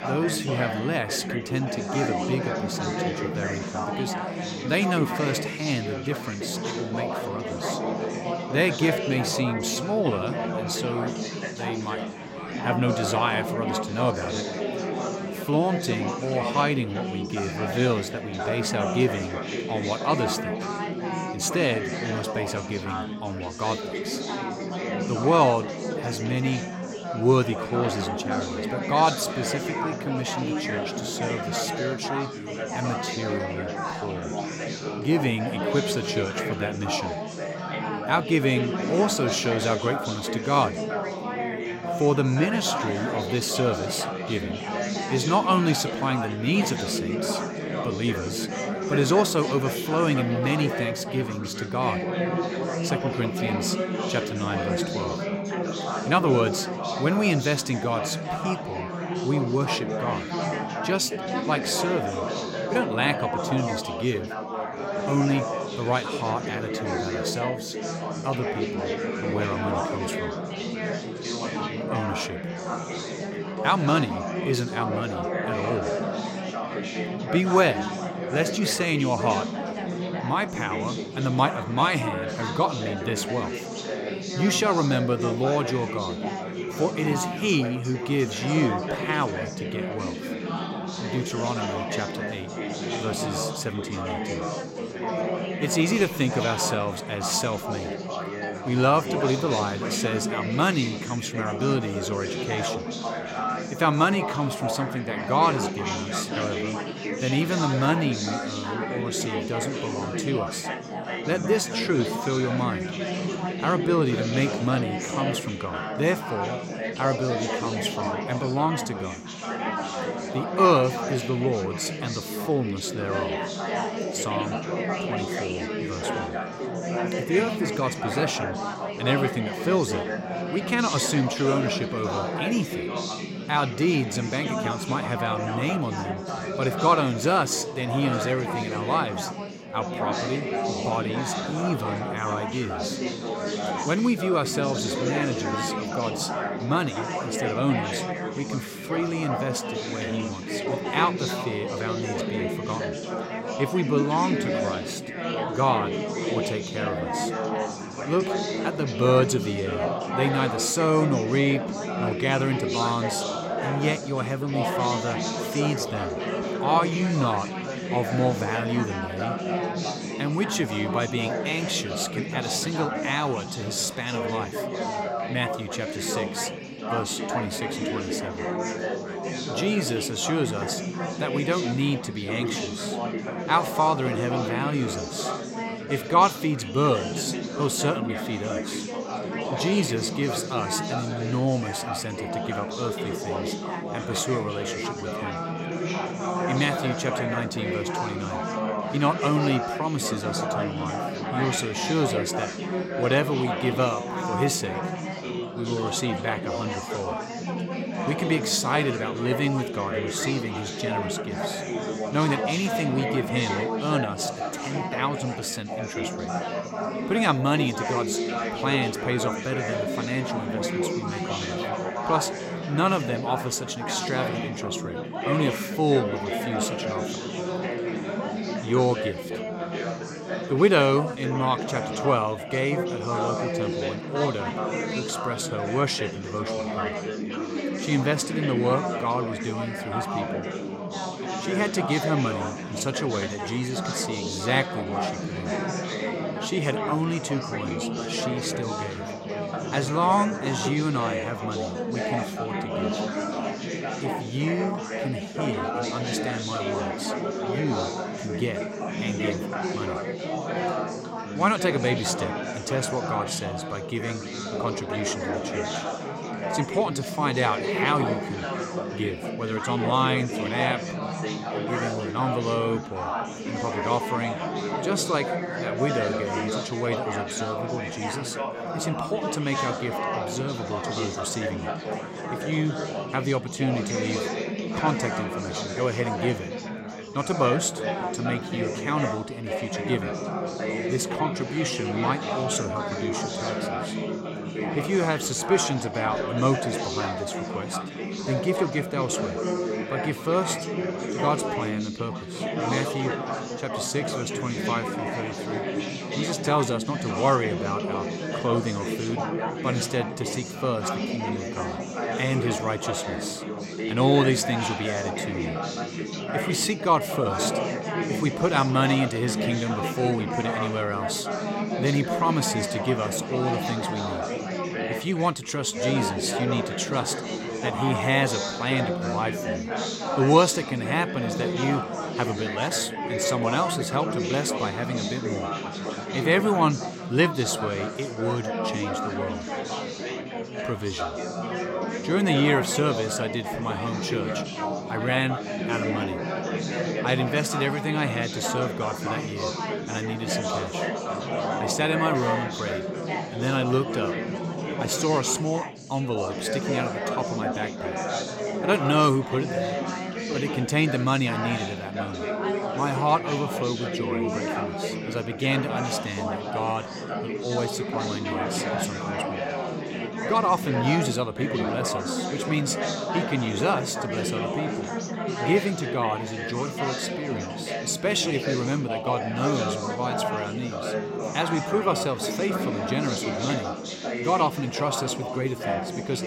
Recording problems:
chatter from many people; loud; throughout; 2 dB below the speech

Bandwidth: 16 kHz